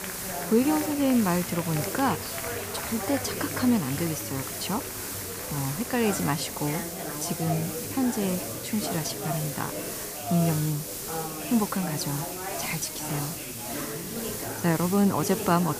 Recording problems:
chatter from many people; loud; throughout; 8 dB below the speech
hiss; loud; throughout; 6 dB below the speech

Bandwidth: 15 kHz